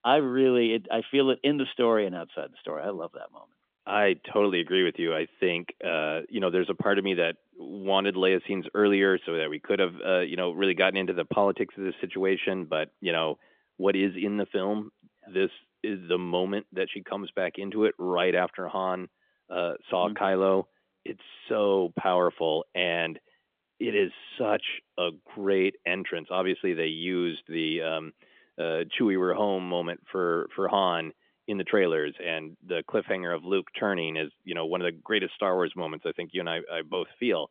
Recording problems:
phone-call audio; nothing above 3.5 kHz

